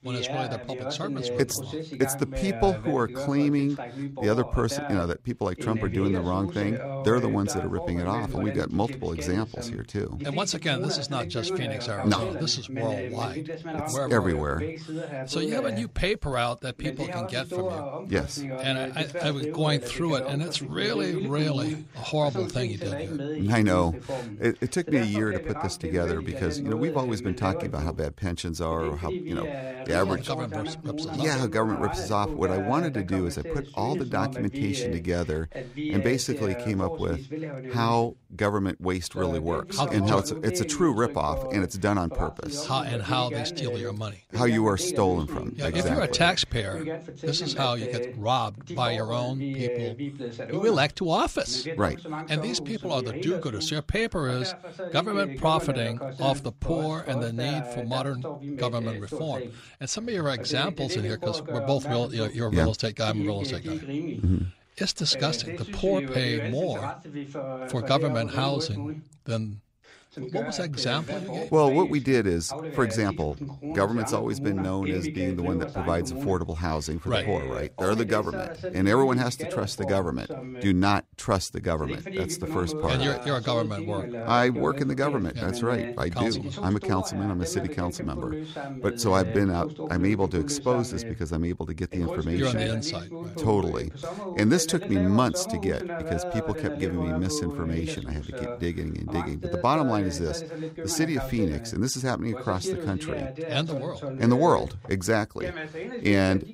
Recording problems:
voice in the background; loud; throughout; 7 dB below the speech

